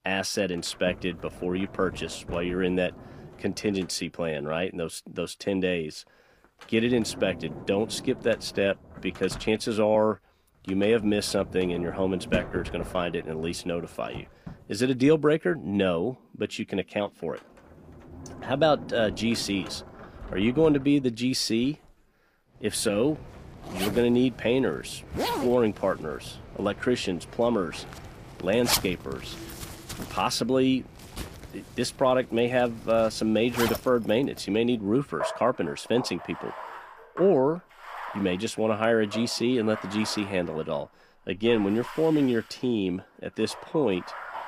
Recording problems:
household noises; noticeable; throughout; 10 dB below the speech

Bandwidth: 15 kHz